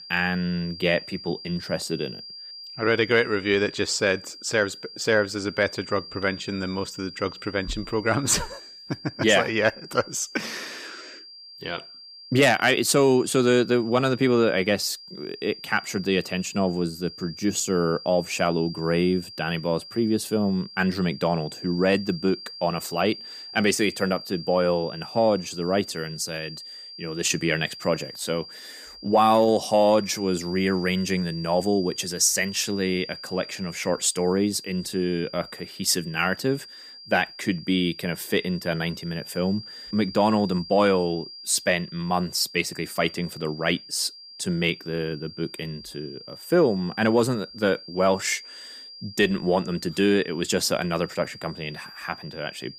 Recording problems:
high-pitched whine; noticeable; throughout; 5 kHz, 15 dB below the speech

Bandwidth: 15 kHz